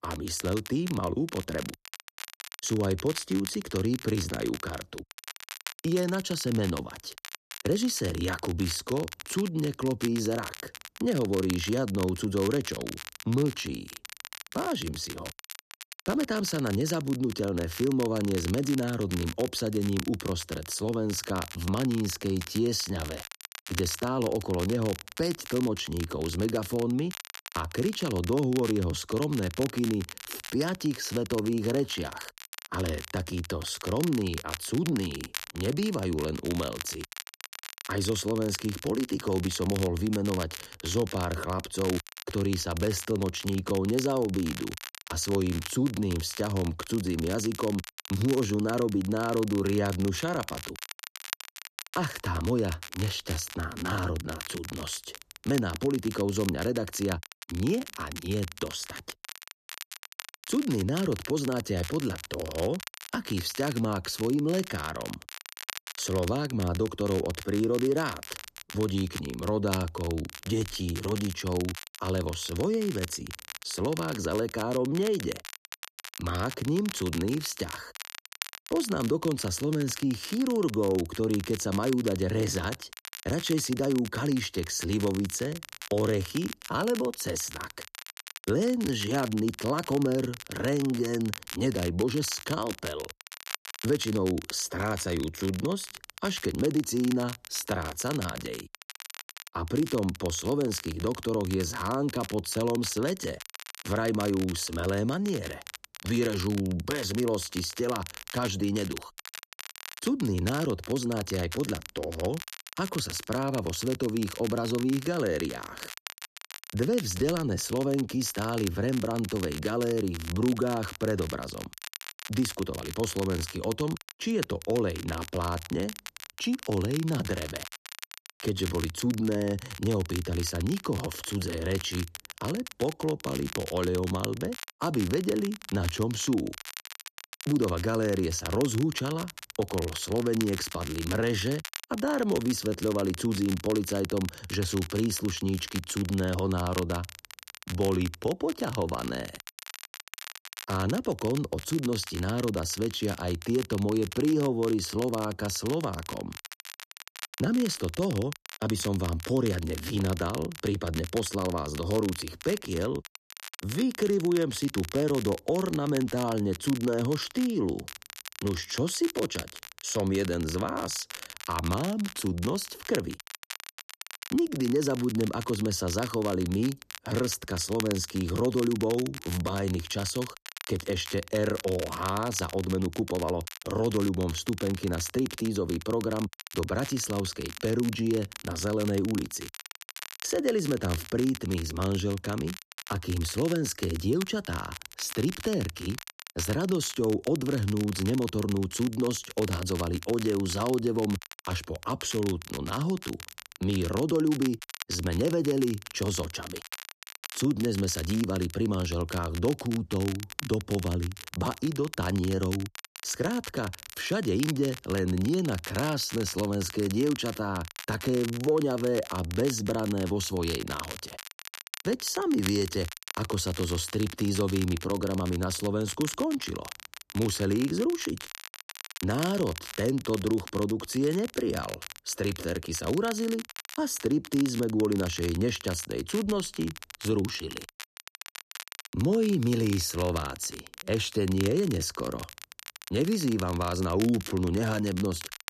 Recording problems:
crackle, like an old record; noticeable; 10 dB below the speech

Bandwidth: 14 kHz